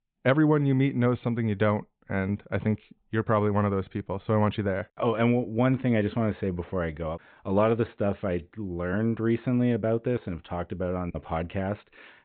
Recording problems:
high frequencies cut off; severe; nothing above 4 kHz

